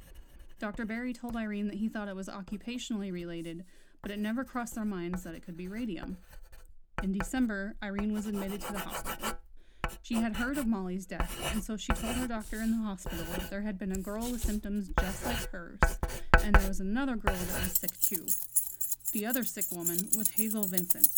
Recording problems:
household noises; very loud; throughout; 5 dB above the speech

